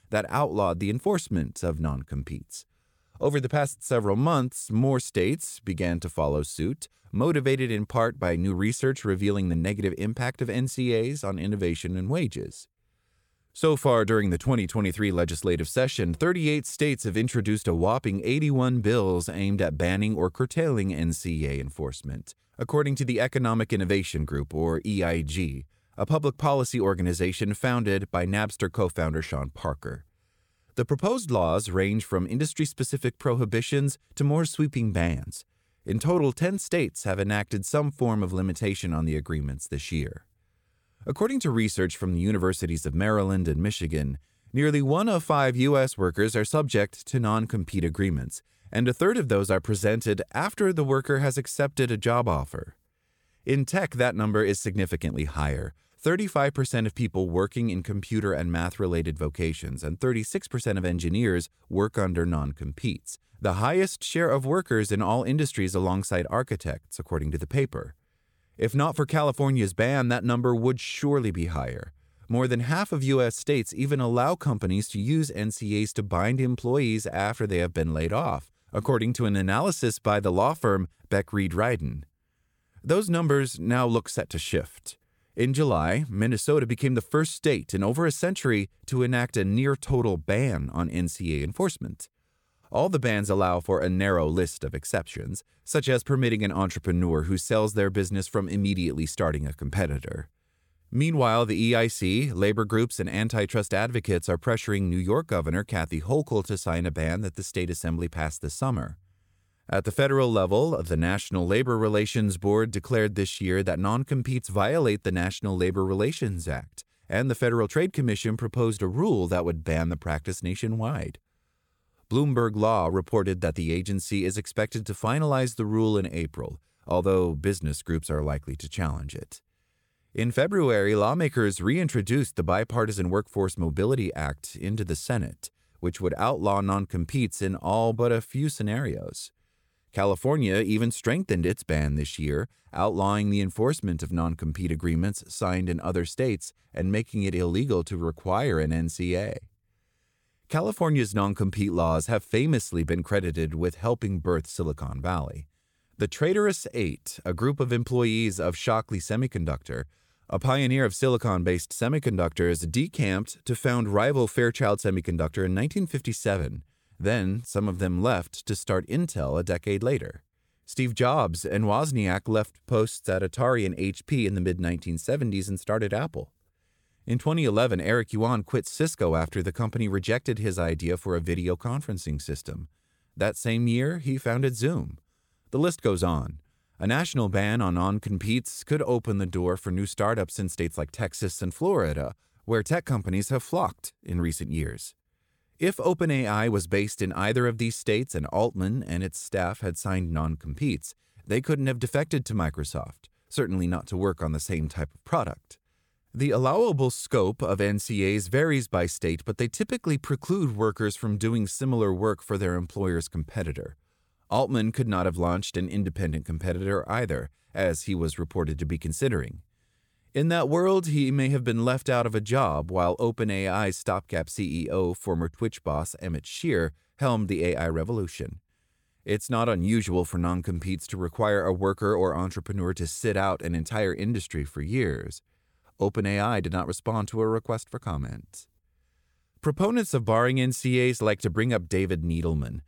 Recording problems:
none

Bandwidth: 18.5 kHz